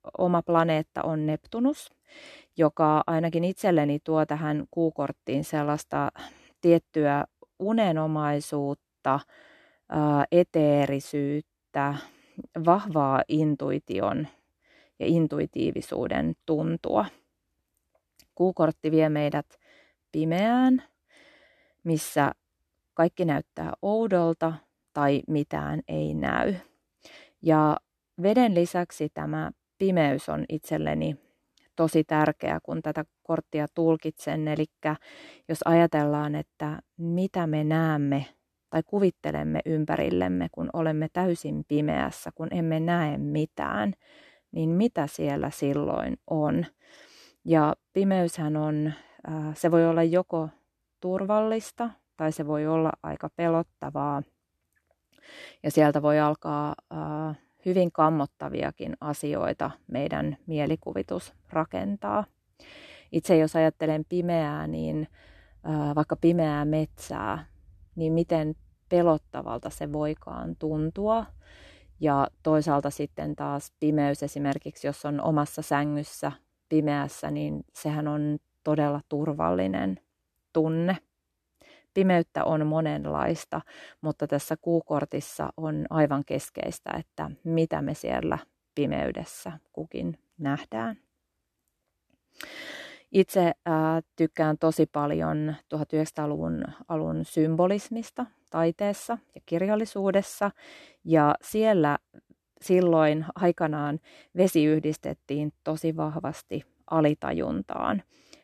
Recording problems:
none

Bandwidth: 13.5 kHz